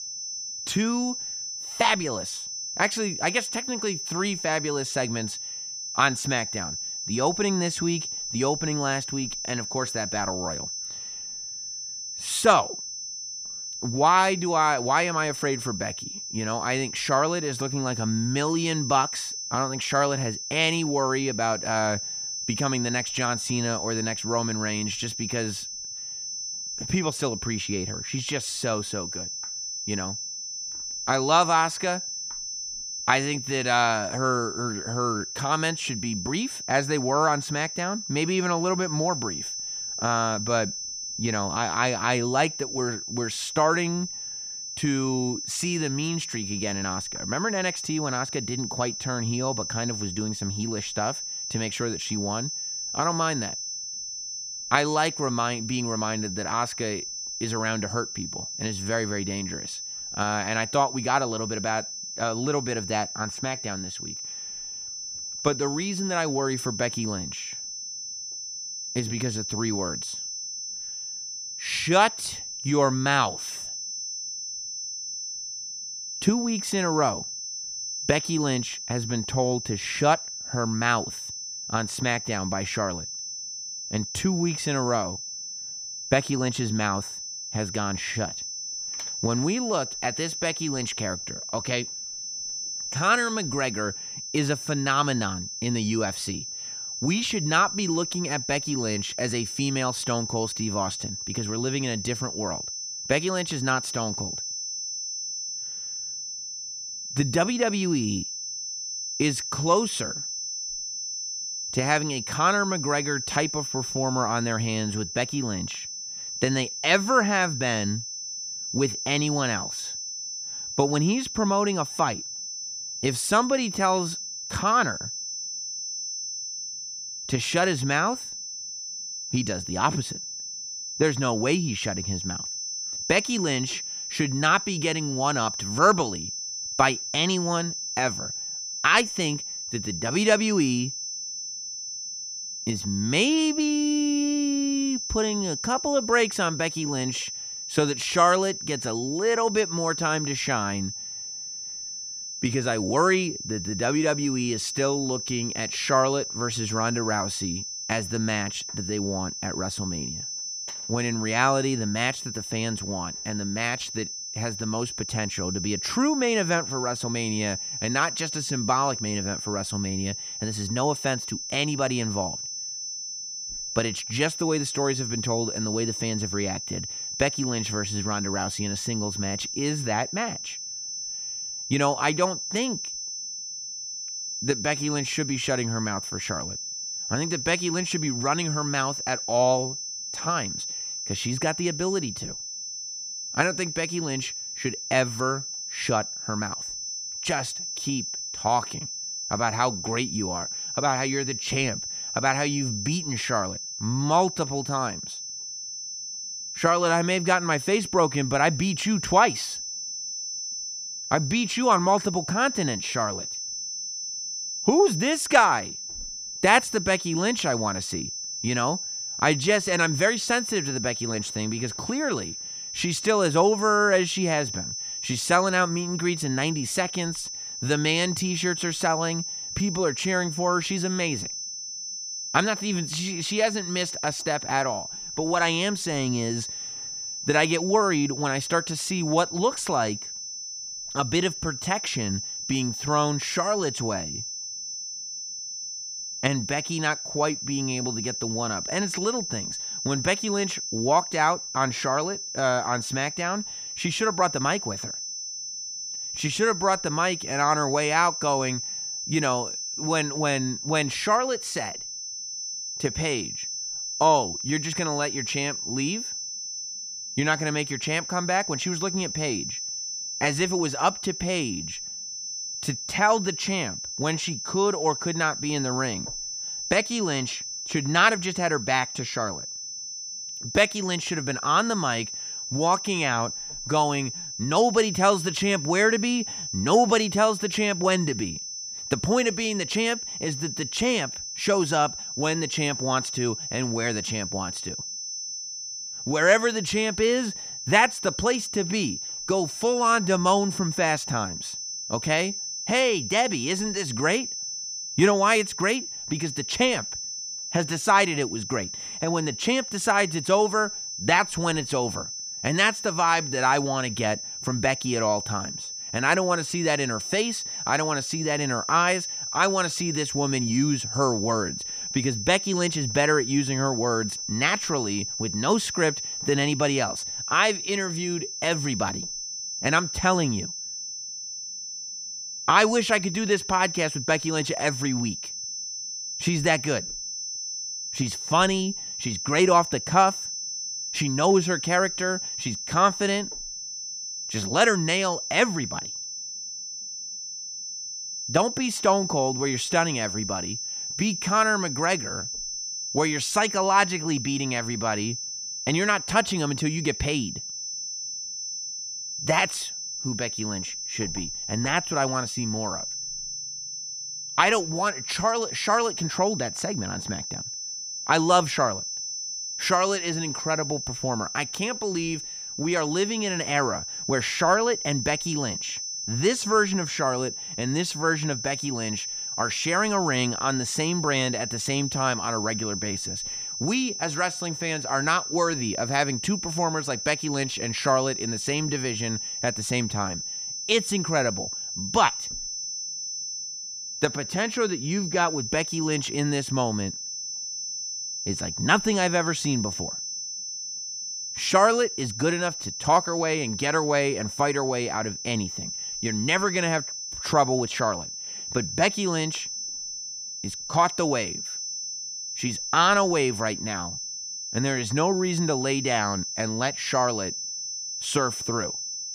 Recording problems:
high-pitched whine; loud; throughout; 6 kHz, 5 dB below the speech

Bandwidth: 15 kHz